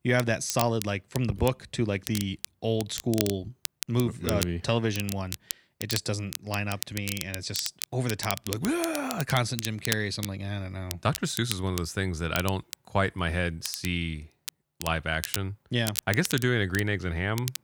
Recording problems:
crackle, like an old record; loud; 8 dB below the speech

